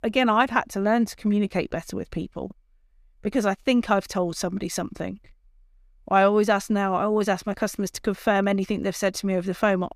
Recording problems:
none

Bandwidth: 14.5 kHz